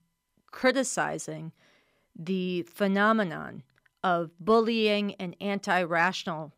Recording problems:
none

